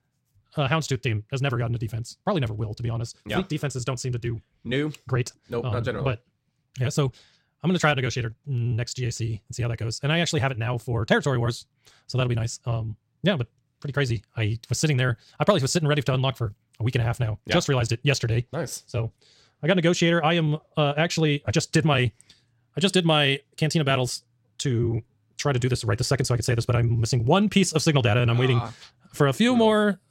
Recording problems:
wrong speed, natural pitch; too fast; 1.8 times normal speed

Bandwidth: 16 kHz